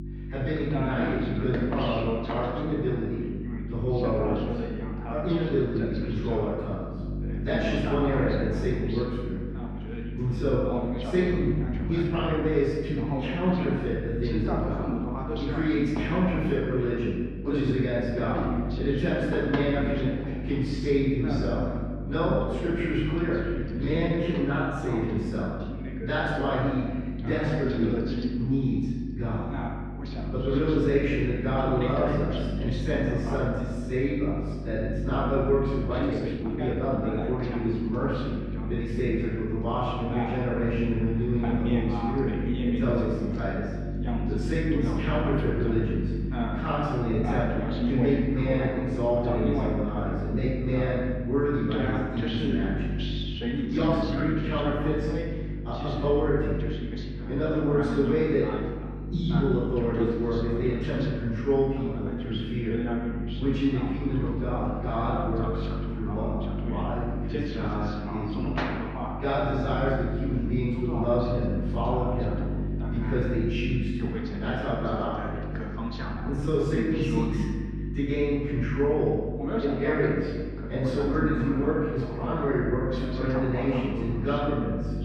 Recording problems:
room echo; strong; dies away in 1.3 s
off-mic speech; far
muffled; very; fading above 2.5 kHz
voice in the background; loud; throughout; 7 dB below the speech
electrical hum; noticeable; throughout; 50 Hz, 15 dB below the speech
uneven, jittery; strongly; from 12 s to 1:17

